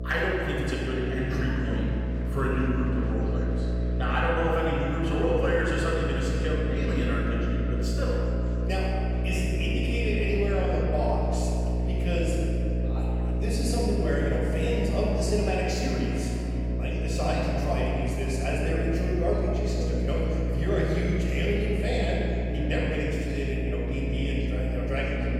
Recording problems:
room echo; strong; dies away in 2.7 s
off-mic speech; far
electrical hum; loud; throughout; 60 Hz, 8 dB below the speech
chatter from many people; faint; throughout; 25 dB below the speech

